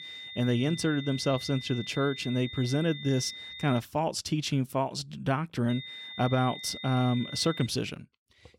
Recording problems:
high-pitched whine; noticeable; until 4 s and from 5.5 to 7.5 s; 3.5 kHz, 10 dB below the speech

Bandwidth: 16.5 kHz